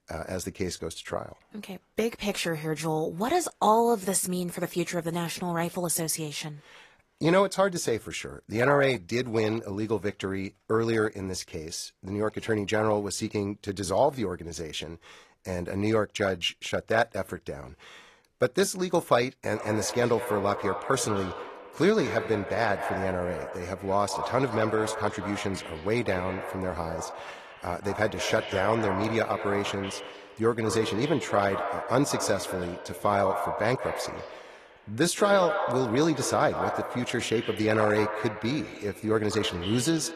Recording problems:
echo of what is said; strong; from 20 s on; 190 ms later, 8 dB below the speech
garbled, watery; slightly; nothing above 13.5 kHz

